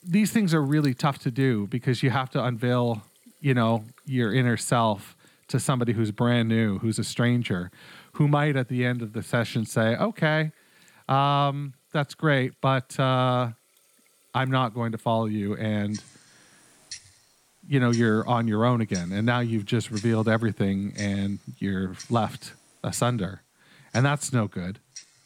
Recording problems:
household noises; faint; throughout; 20 dB below the speech

